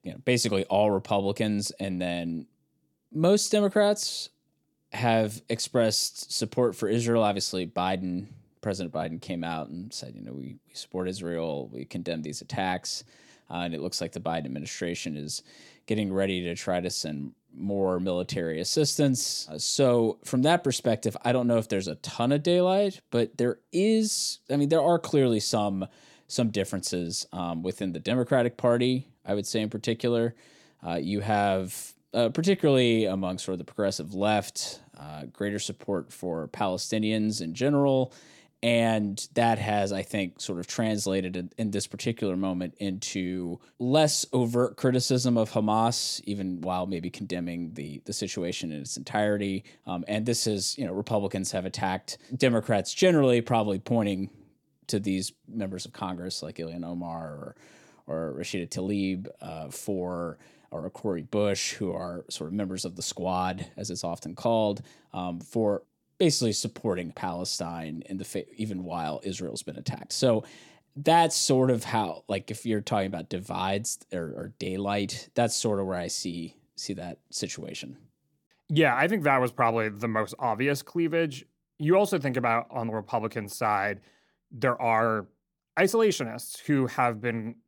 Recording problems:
none

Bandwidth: 18 kHz